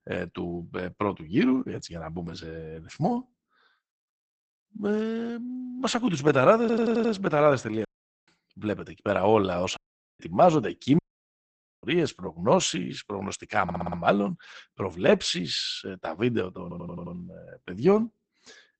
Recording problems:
garbled, watery; badly; nothing above 8 kHz
audio stuttering; at 6.5 s, at 14 s and at 17 s
audio cutting out; at 8 s, at 10 s and at 11 s for 1 s

